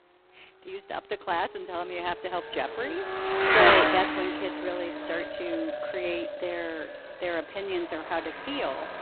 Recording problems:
phone-call audio; poor line; nothing above 4 kHz
echo of what is said; strong; throughout; 440 ms later, 9 dB below the speech
traffic noise; very loud; throughout; 6 dB above the speech

